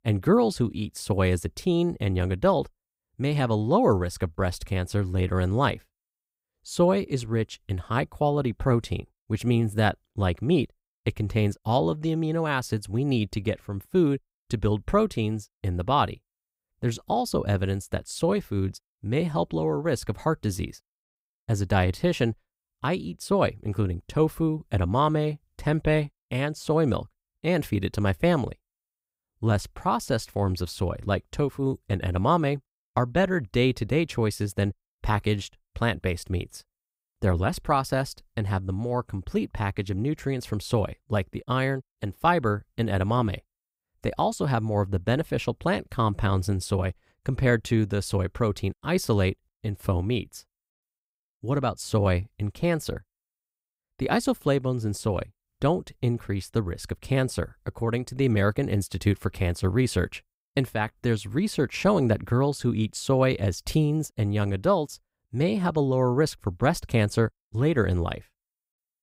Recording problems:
none

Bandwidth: 15.5 kHz